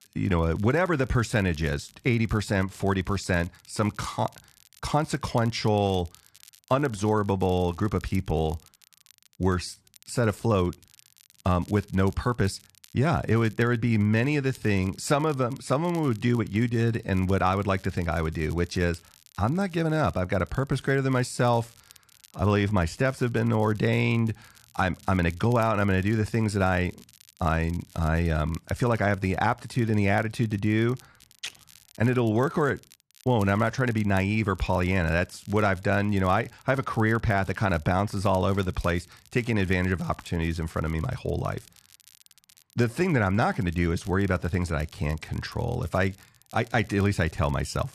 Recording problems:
crackle, like an old record; faint; 25 dB below the speech

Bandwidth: 13.5 kHz